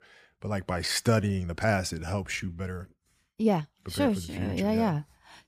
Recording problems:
uneven, jittery; strongly; from 0.5 to 5 s

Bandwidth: 15 kHz